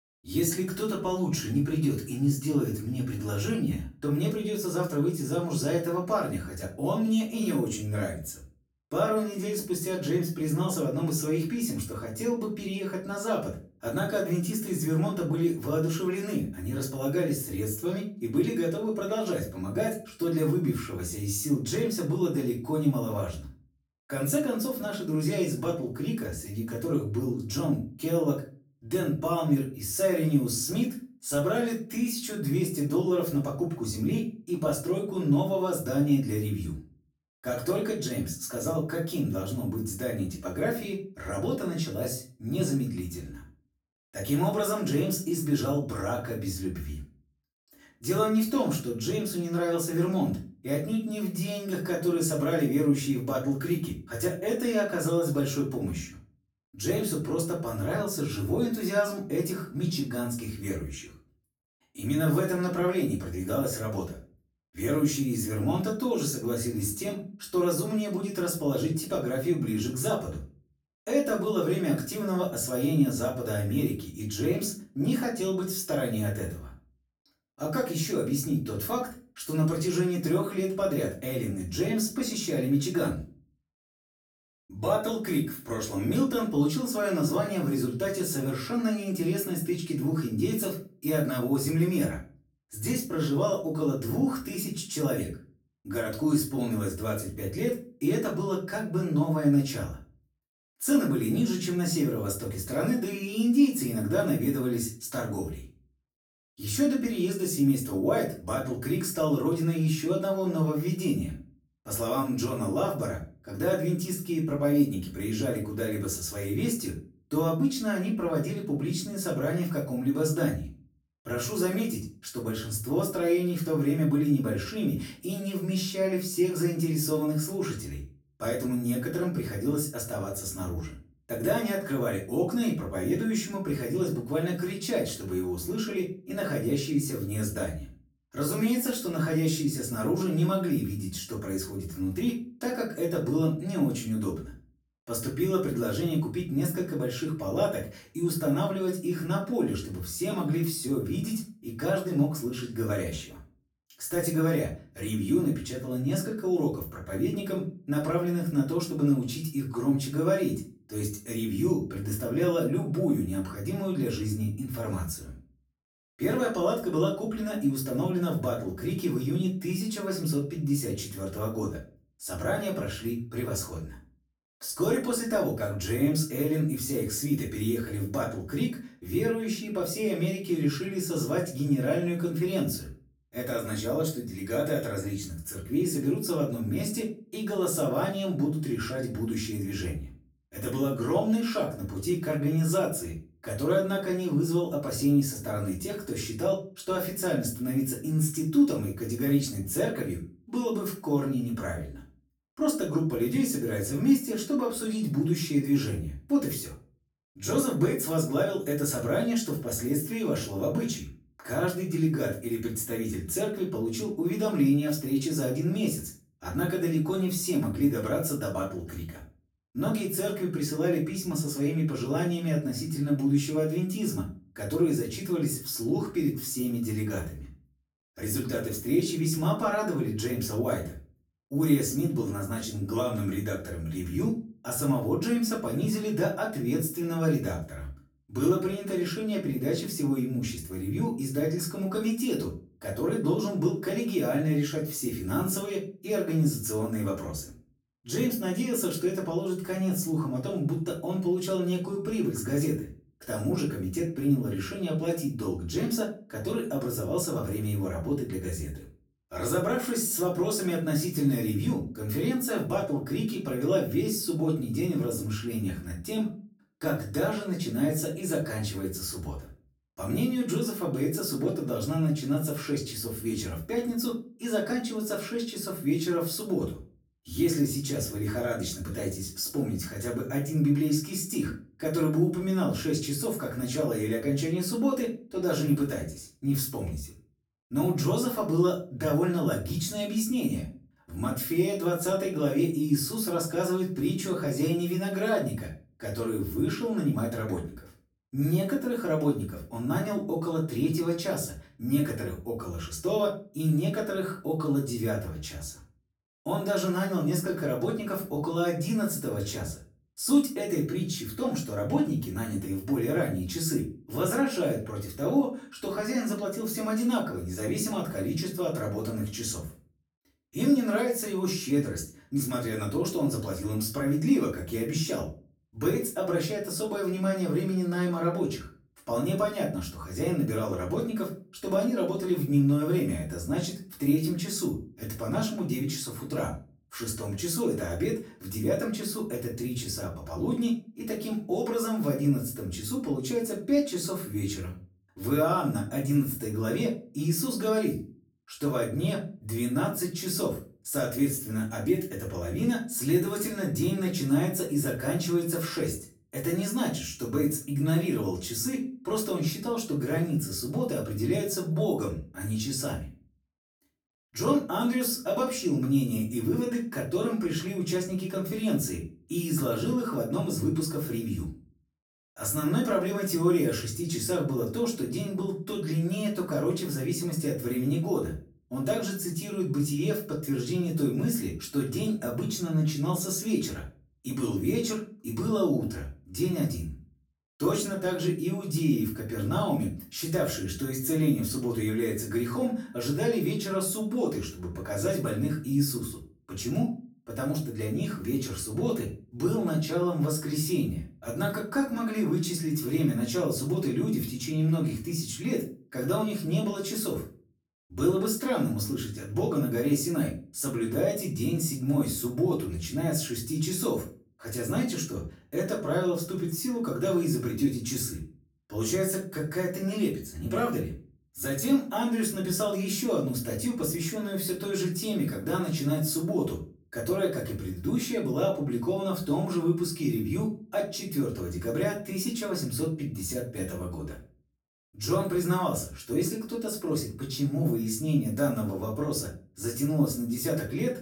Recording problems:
off-mic speech; far
room echo; slight; dies away in 0.3 s

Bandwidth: 18.5 kHz